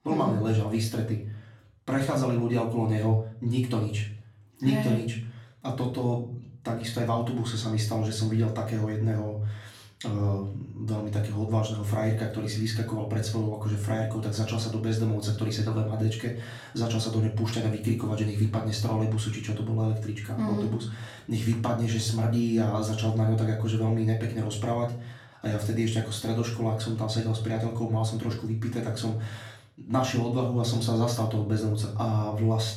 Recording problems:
off-mic speech; far
room echo; slight; dies away in 0.5 s

